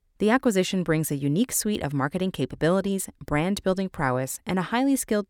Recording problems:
none

